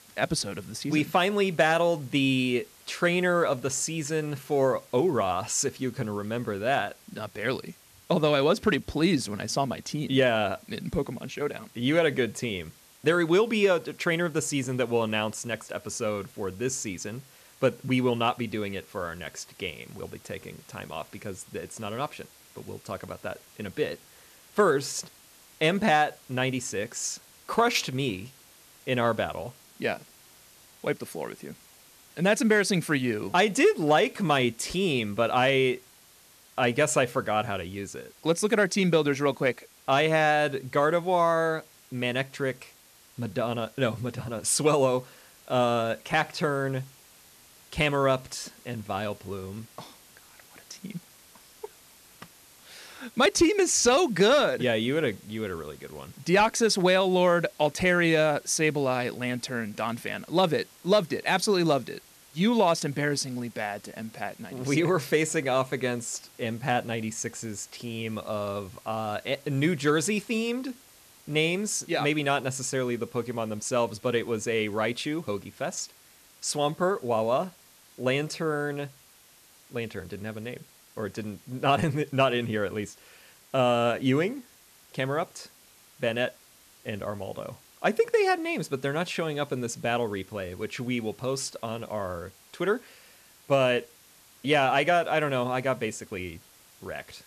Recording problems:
hiss; faint; throughout; 25 dB below the speech

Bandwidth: 14 kHz